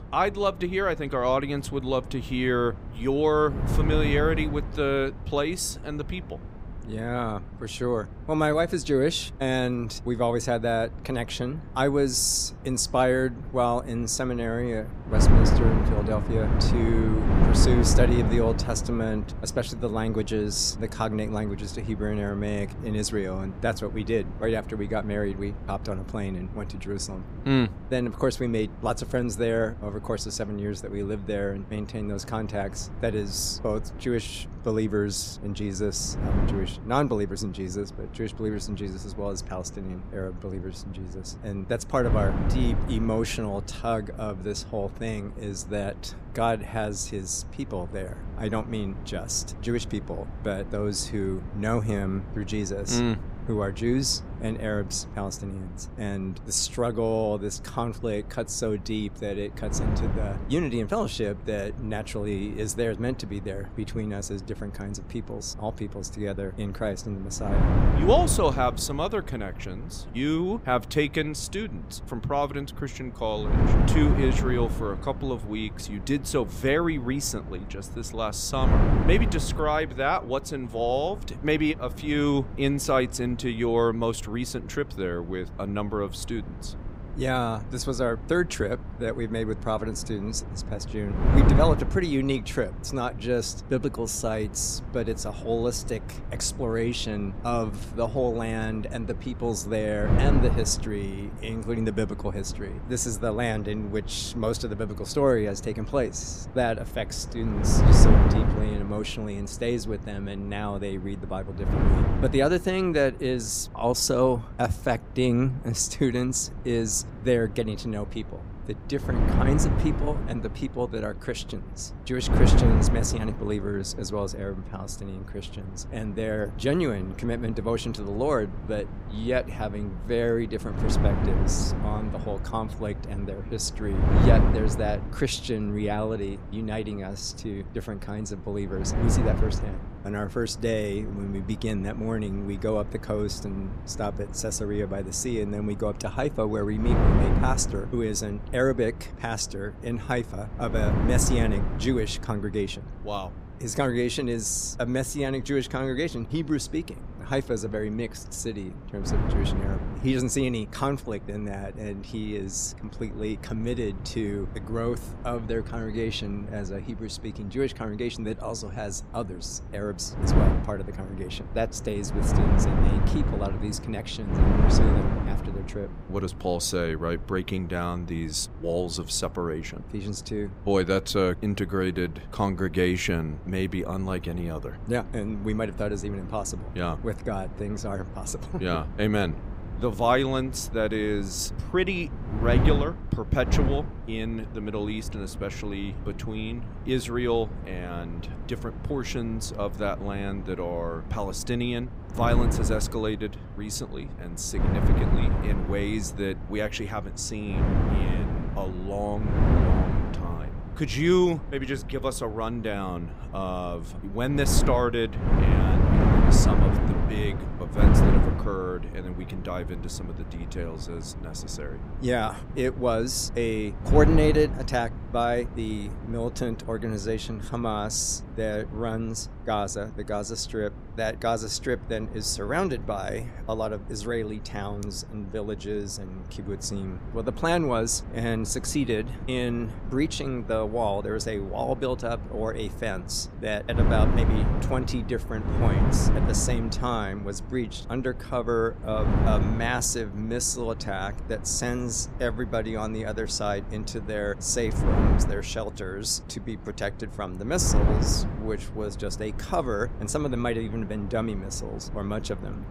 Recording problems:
wind noise on the microphone; heavy; 8 dB below the speech

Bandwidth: 15.5 kHz